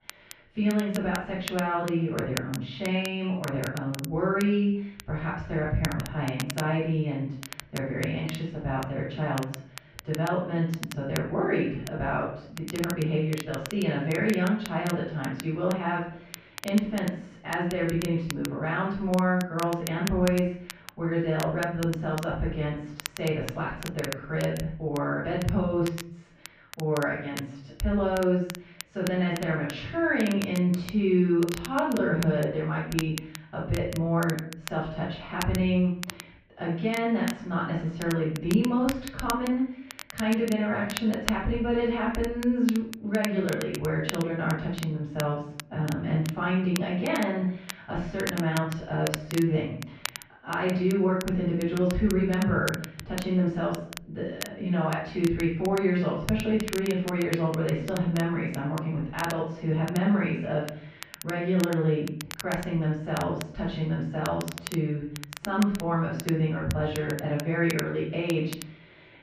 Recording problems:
off-mic speech; far
muffled; very; fading above 2.5 kHz
room echo; noticeable; dies away in 0.5 s
crackle, like an old record; noticeable; 15 dB below the speech

